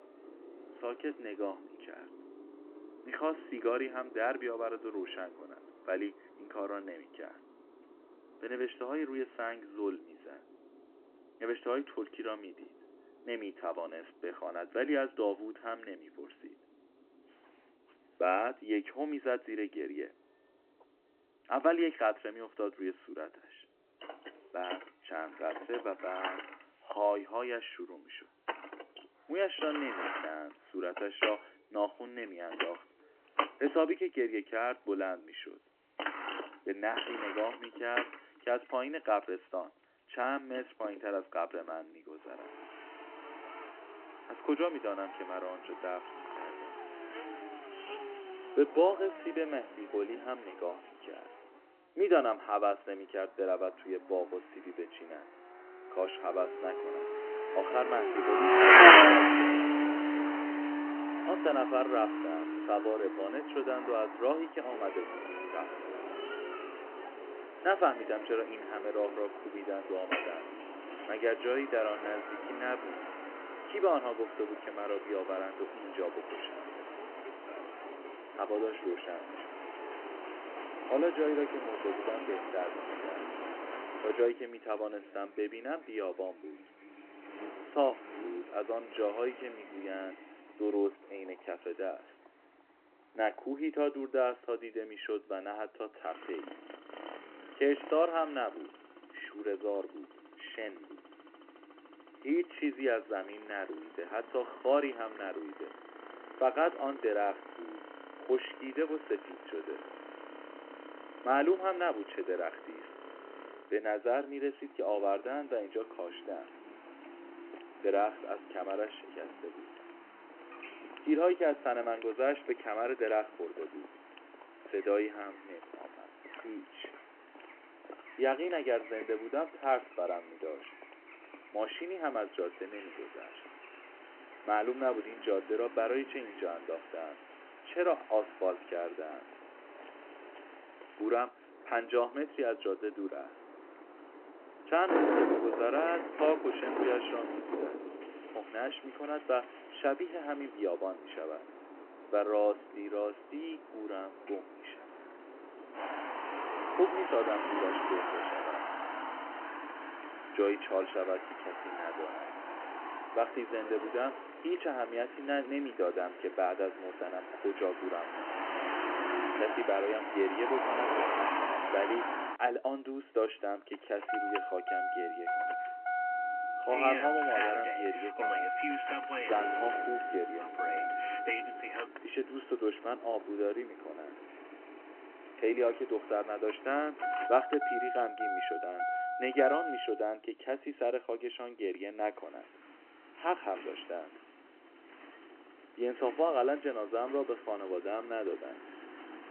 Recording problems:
phone-call audio
traffic noise; very loud; throughout; 4 dB above the speech

